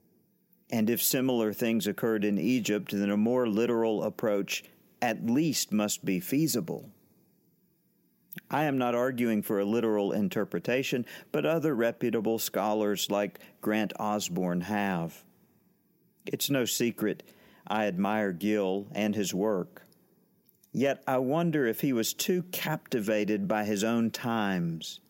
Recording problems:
none

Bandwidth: 16 kHz